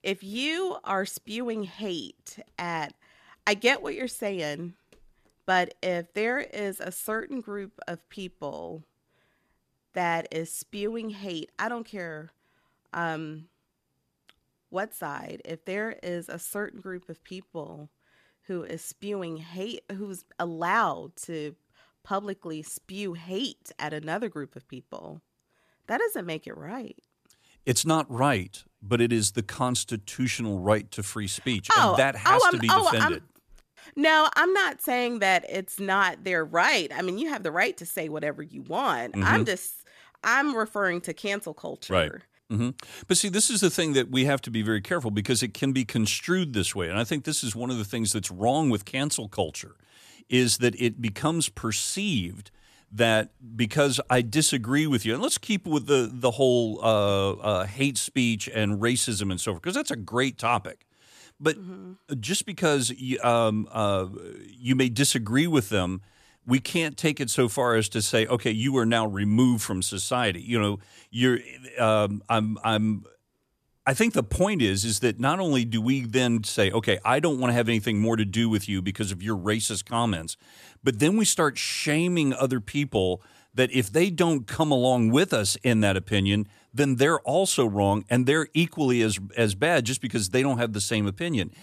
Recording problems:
none

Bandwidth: 14.5 kHz